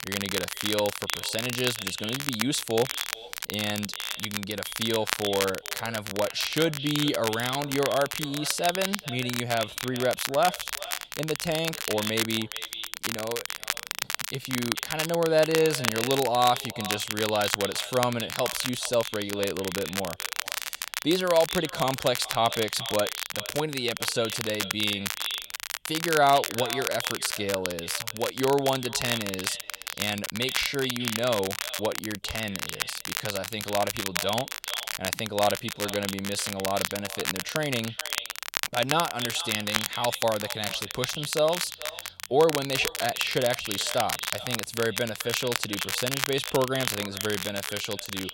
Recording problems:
echo of what is said; strong; throughout; 430 ms later, 10 dB below the speech
crackle, like an old record; loud; 4 dB below the speech

